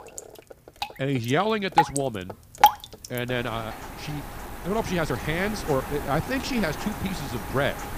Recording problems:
rain or running water; loud; throughout; 1 dB below the speech
uneven, jittery; slightly; from 0.5 to 6.5 s

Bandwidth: 15 kHz